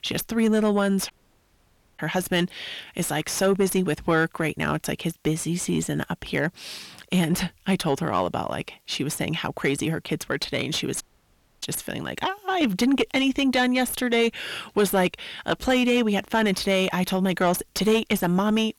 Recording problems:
distortion; slight; 10 dB below the speech
audio cutting out; at 1 s for 1 s and at 11 s for 0.5 s

